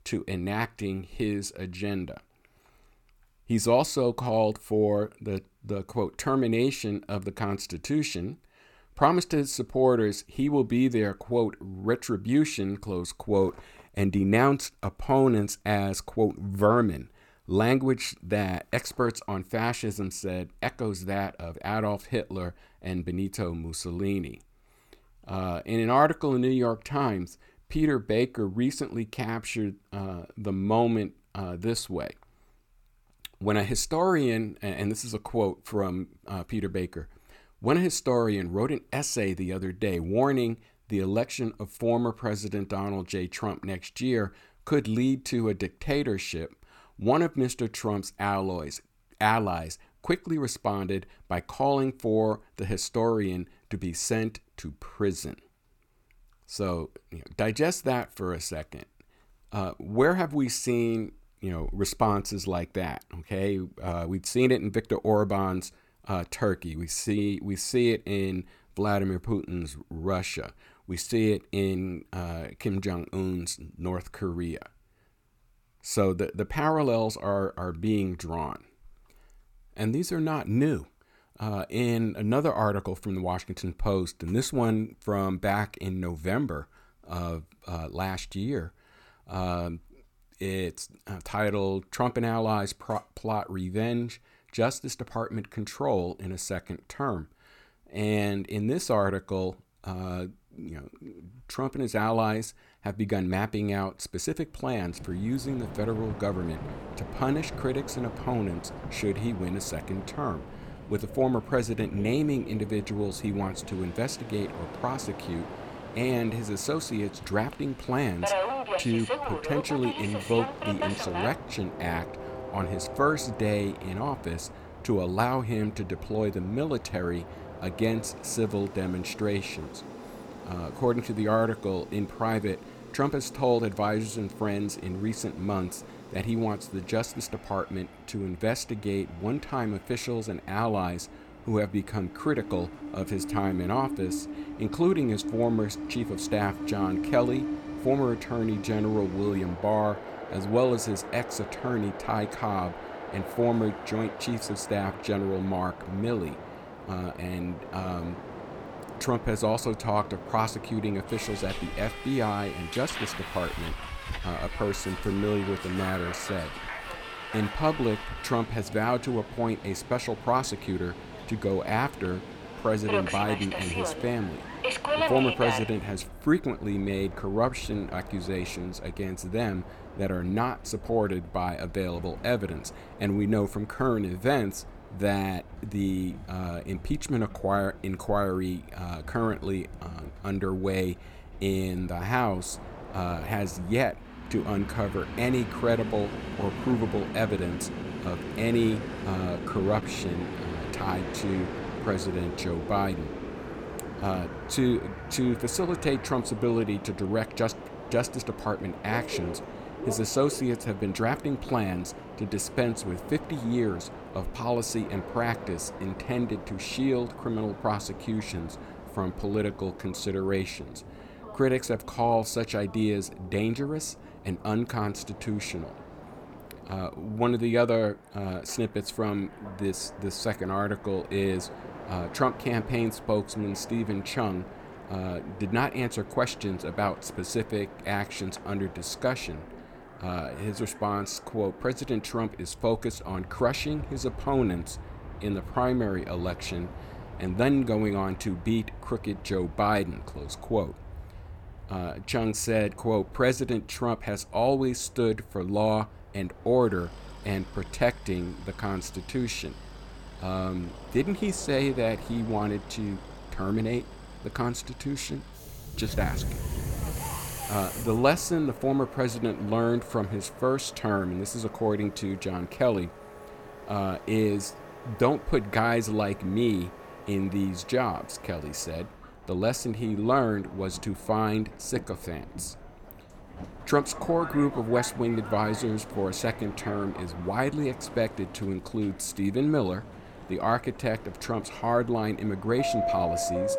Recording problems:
train or aircraft noise; noticeable; from 1:45 on; 10 dB below the speech

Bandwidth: 17 kHz